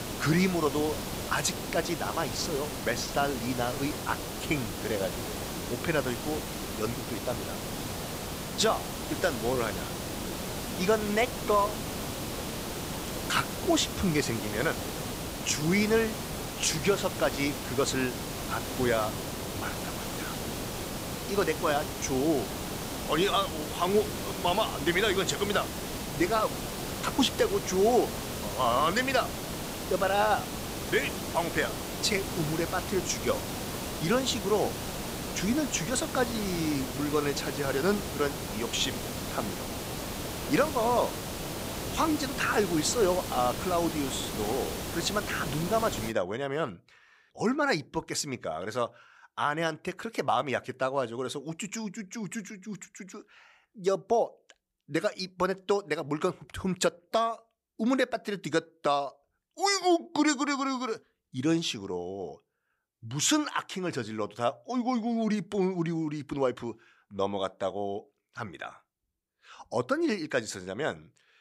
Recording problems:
hiss; loud; until 46 s; 5 dB below the speech

